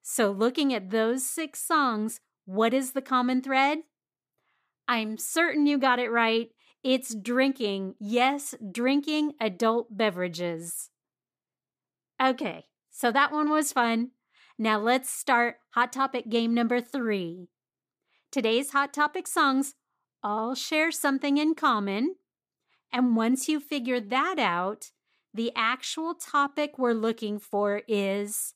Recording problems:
none

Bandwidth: 15 kHz